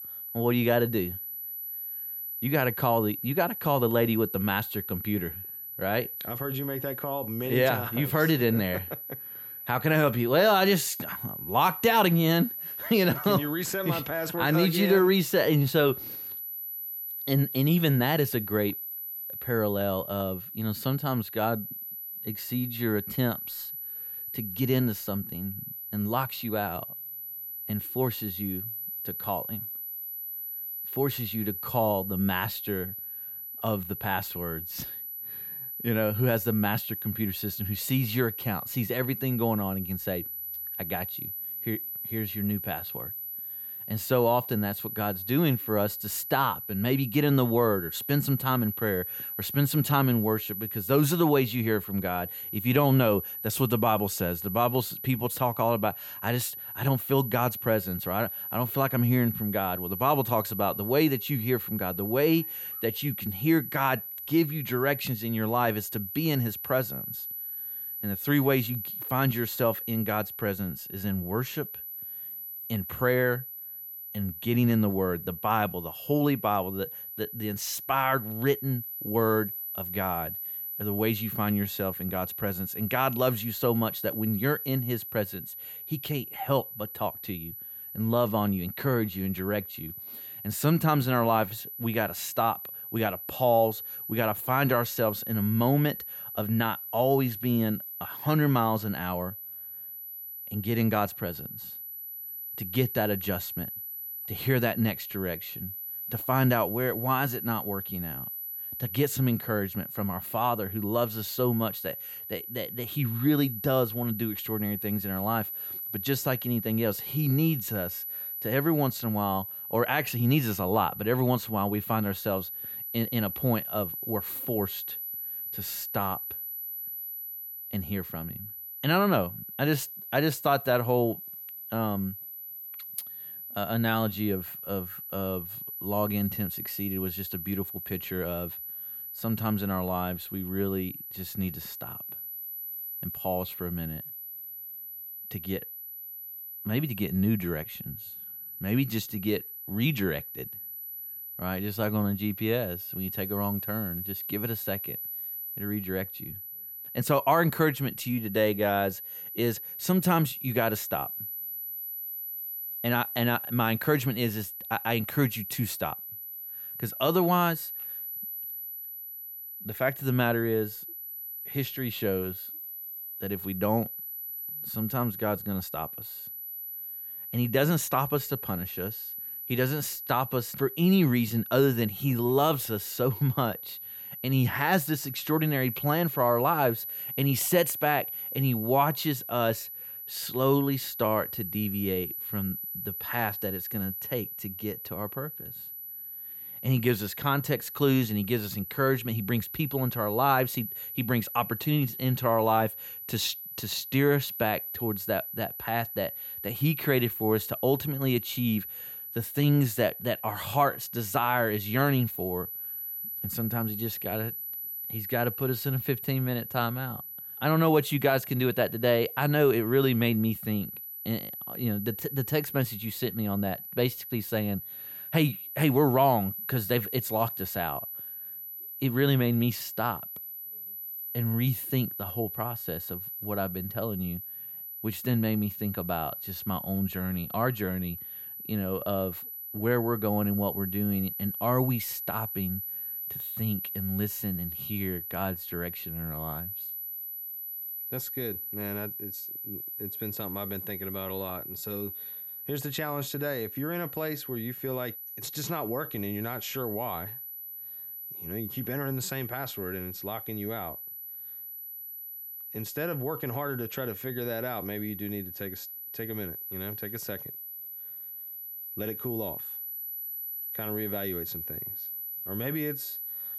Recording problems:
high-pitched whine; loud; throughout; 12 kHz, 6 dB below the speech

